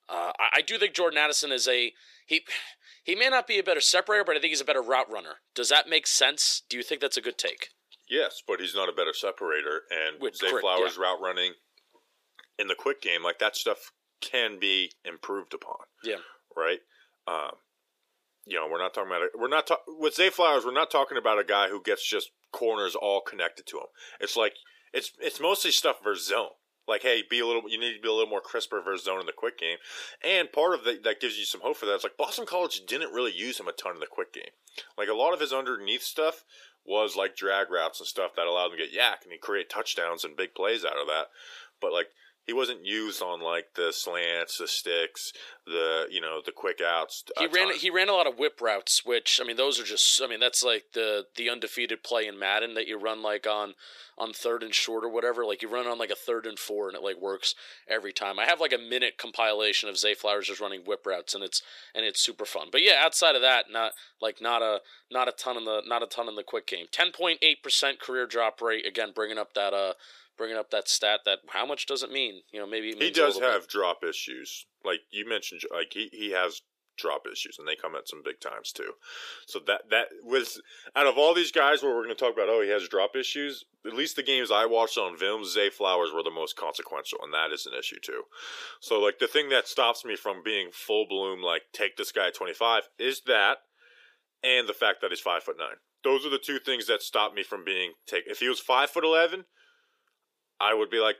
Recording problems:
thin; very; fading below 400 Hz

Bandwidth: 15 kHz